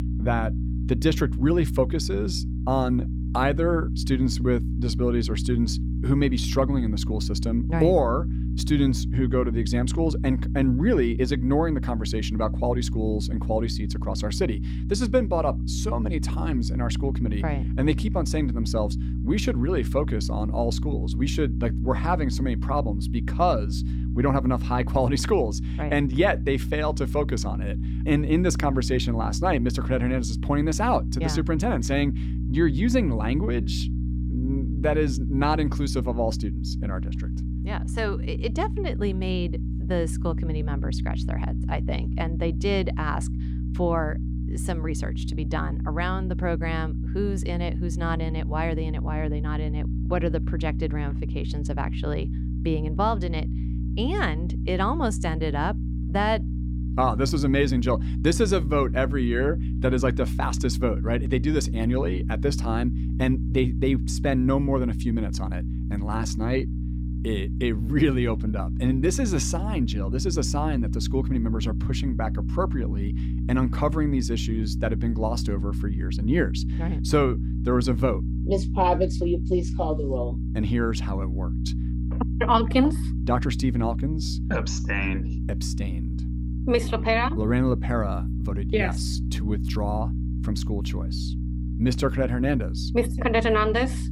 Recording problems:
electrical hum; noticeable; throughout; 60 Hz, 10 dB below the speech

